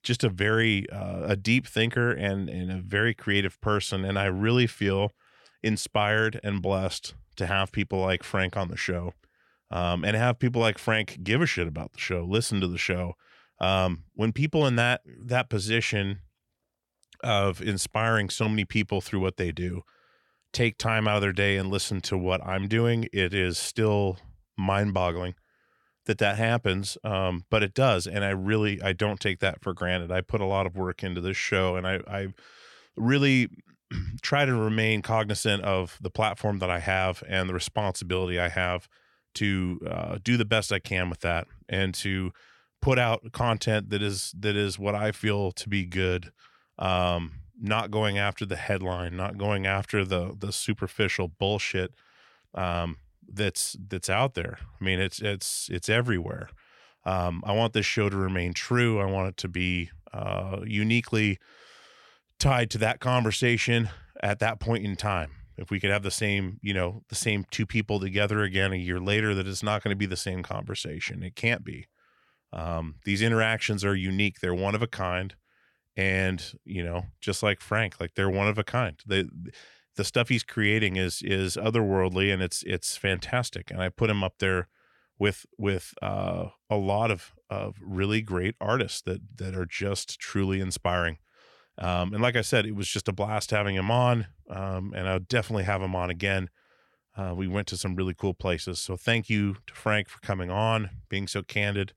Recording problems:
none

